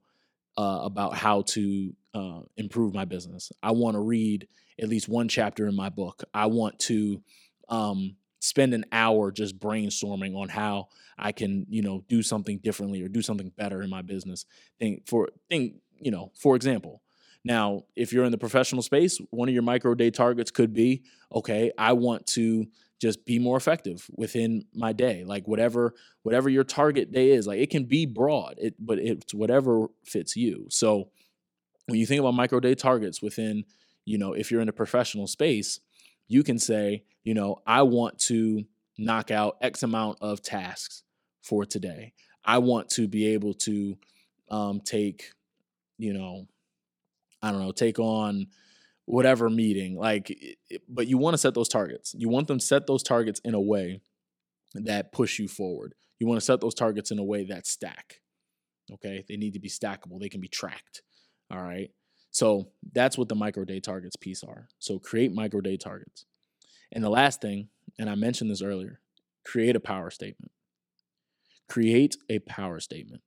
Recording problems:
none

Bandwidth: 17 kHz